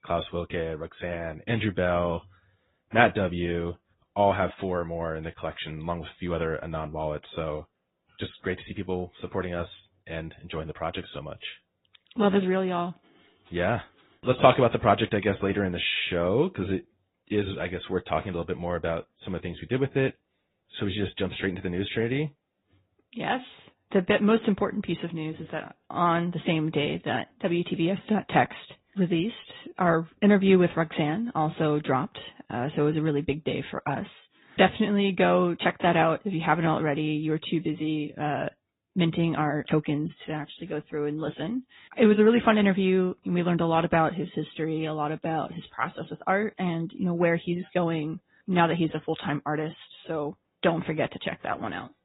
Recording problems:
high frequencies cut off; severe; nothing above 4 kHz
garbled, watery; slightly

